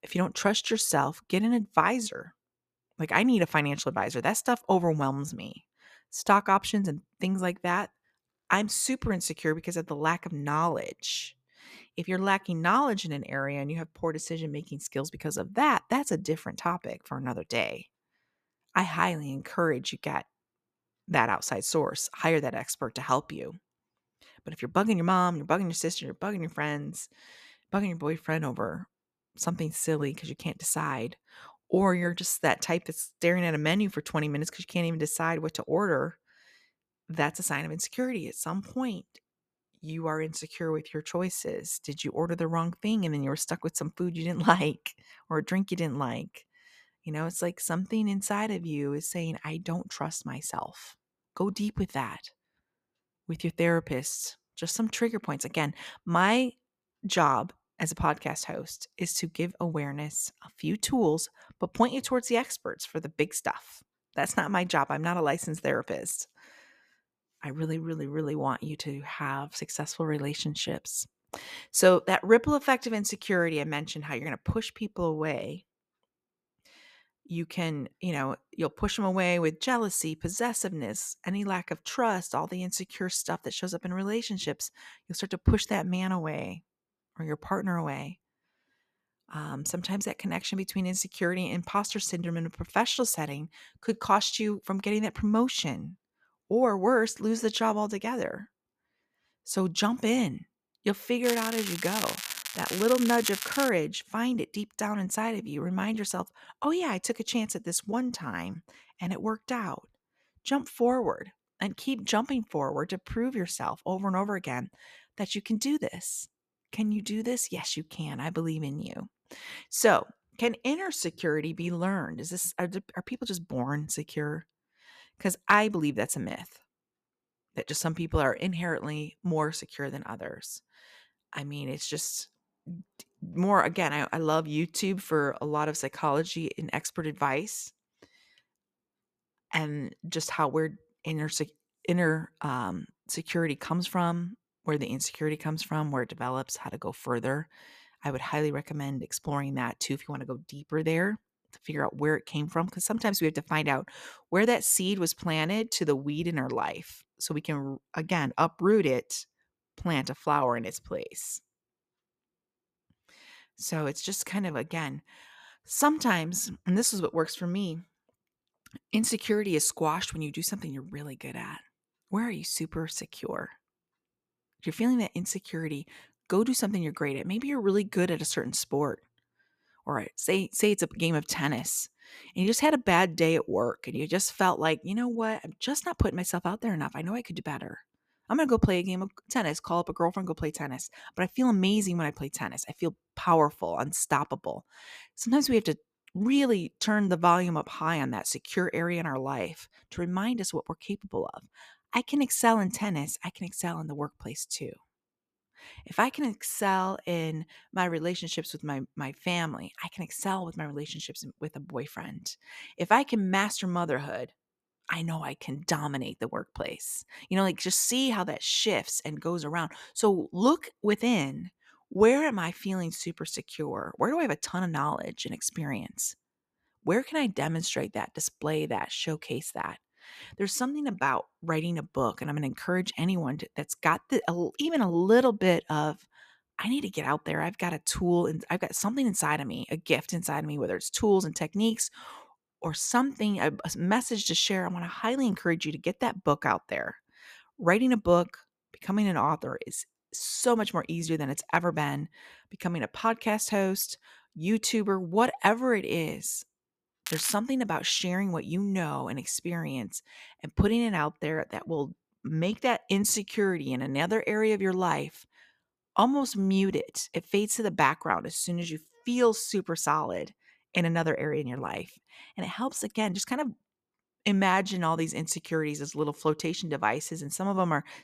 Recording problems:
crackling; loud; from 1:41 to 1:44 and at 4:17; 5 dB below the speech

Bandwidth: 14.5 kHz